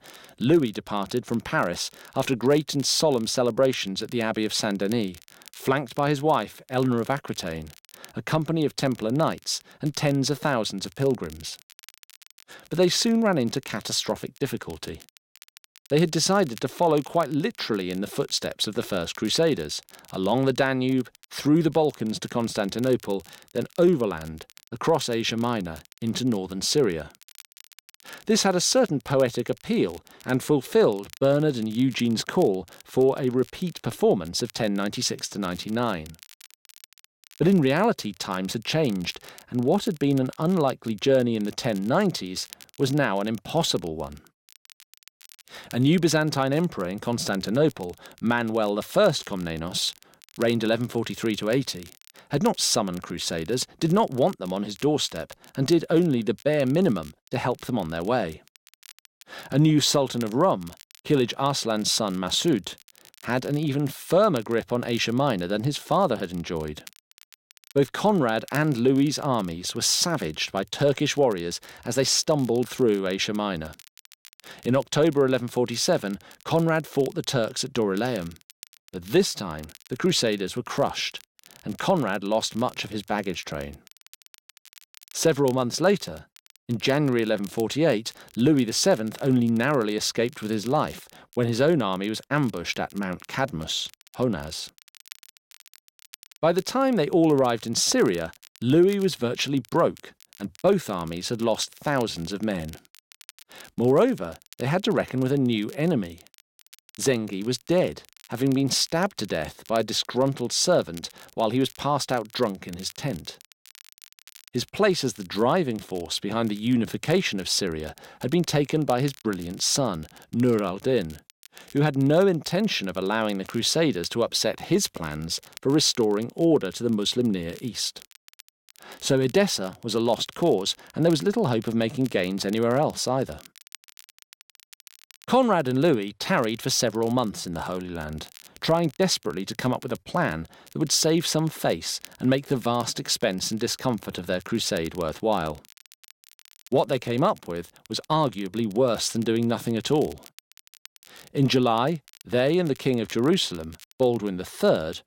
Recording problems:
crackle, like an old record; faint; 25 dB below the speech

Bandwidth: 16.5 kHz